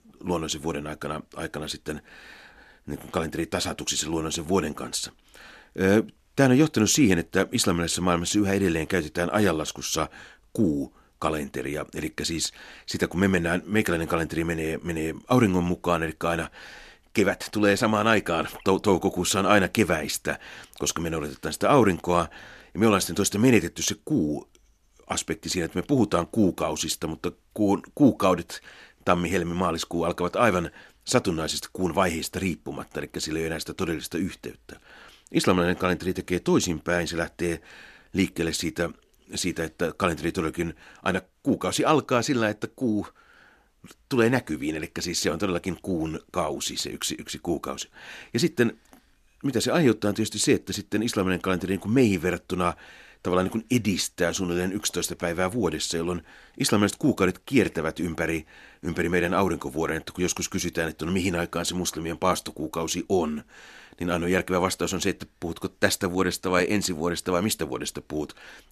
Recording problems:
none

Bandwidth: 13.5 kHz